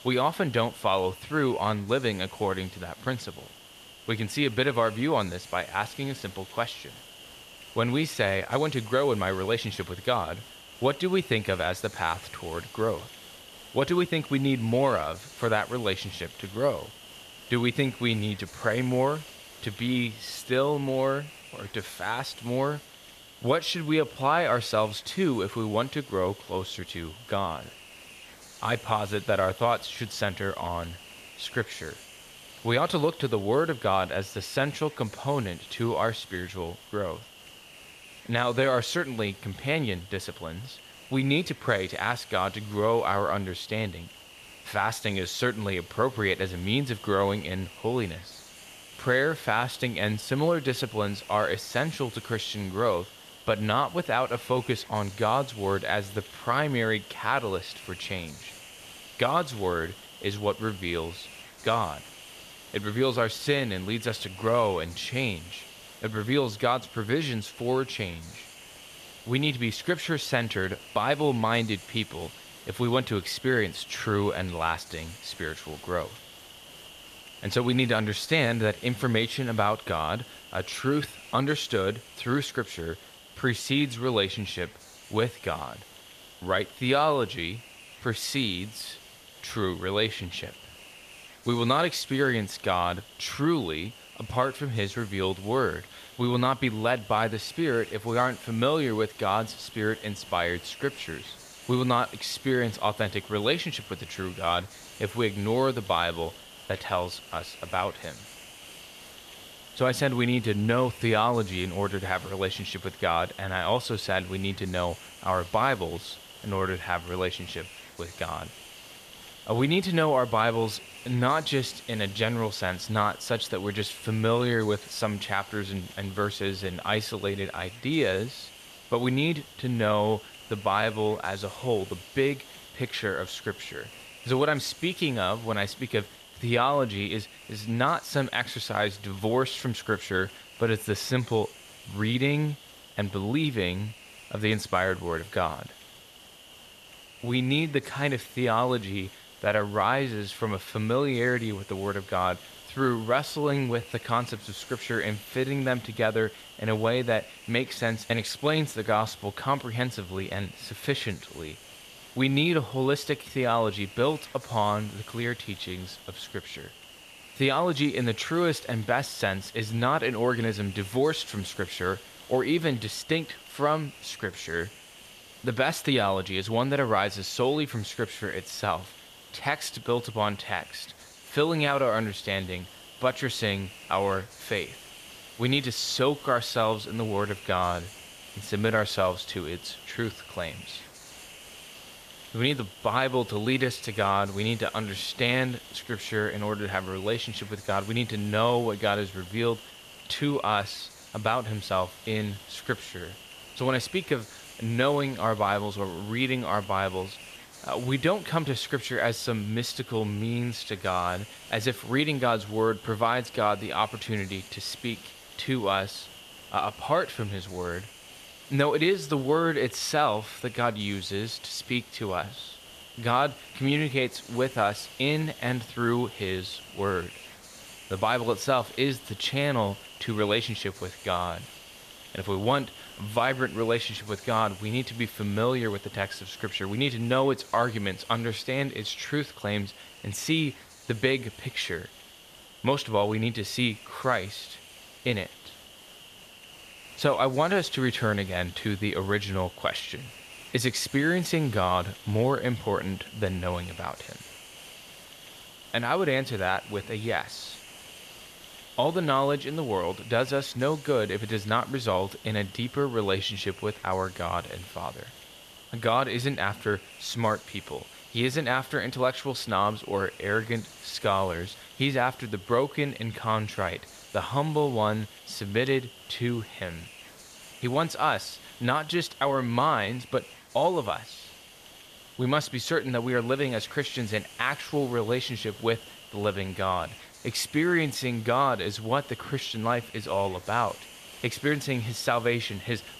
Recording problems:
hiss; noticeable; throughout; 15 dB below the speech

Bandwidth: 14.5 kHz